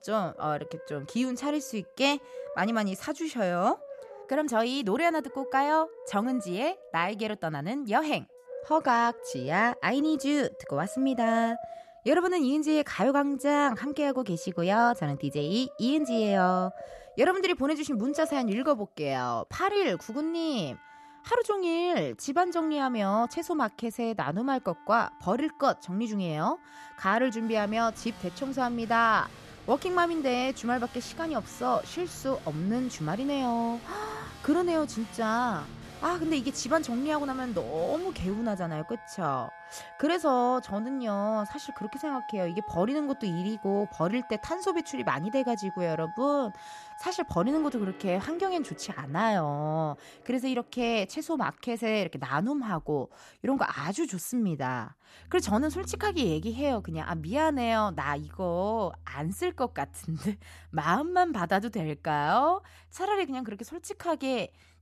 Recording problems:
background music; noticeable; throughout; 15 dB below the speech

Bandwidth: 13.5 kHz